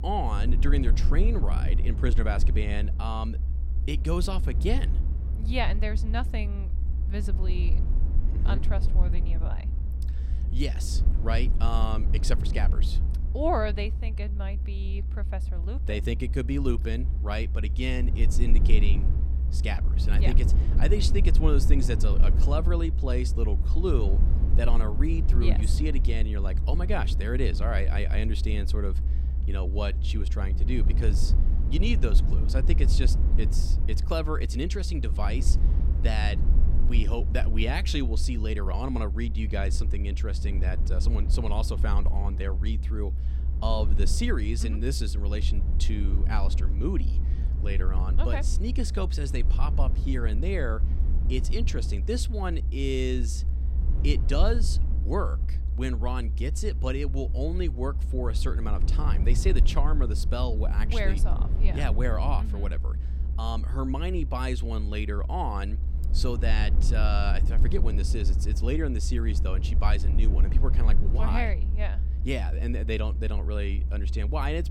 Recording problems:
low rumble; noticeable; throughout; 10 dB below the speech

